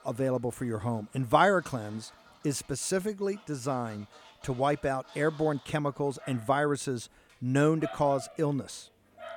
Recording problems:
animal sounds; faint; throughout; 20 dB below the speech

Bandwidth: 18 kHz